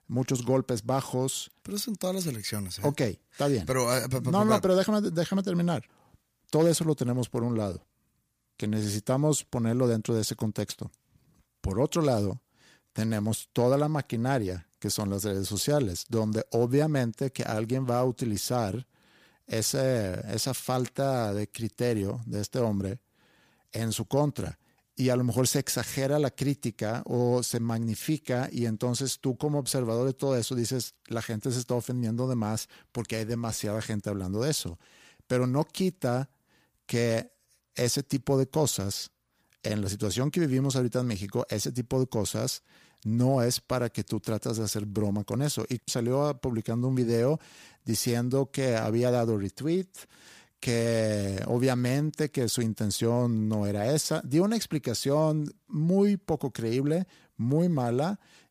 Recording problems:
none

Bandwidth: 15 kHz